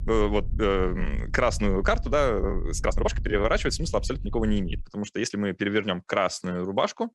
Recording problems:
low rumble; faint; until 5 s; 25 dB below the speech
uneven, jittery; strongly; from 0.5 to 6.5 s

